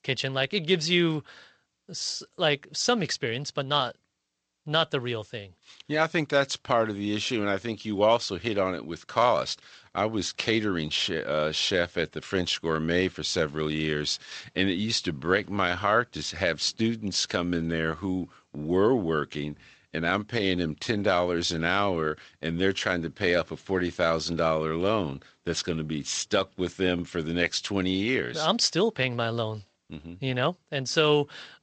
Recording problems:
garbled, watery; slightly; nothing above 7.5 kHz

